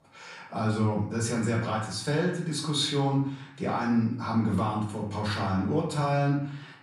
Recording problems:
off-mic speech; far
room echo; noticeable; dies away in 0.6 s

